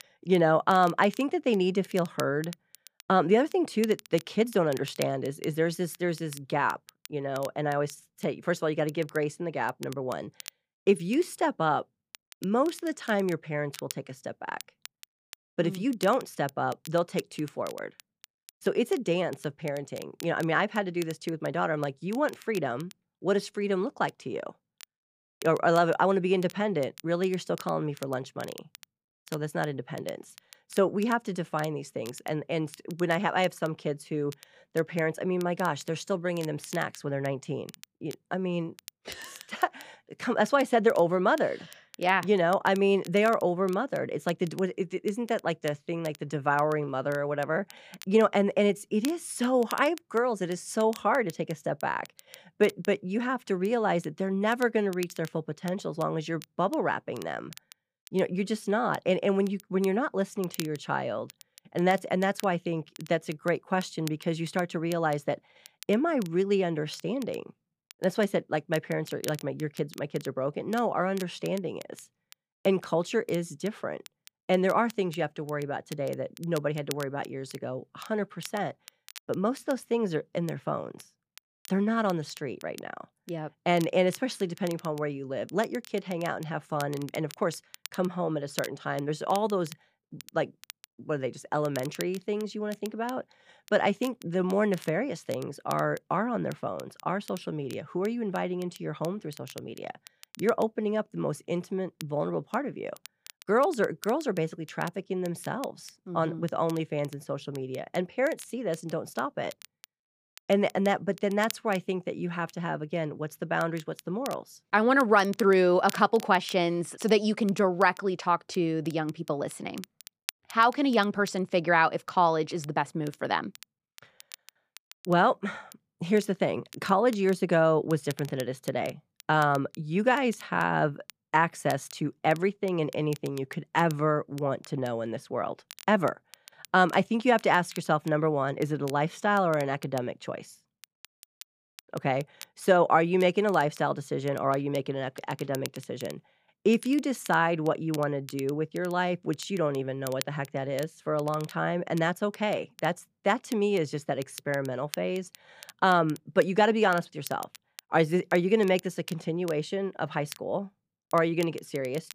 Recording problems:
crackle, like an old record; noticeable; 20 dB below the speech

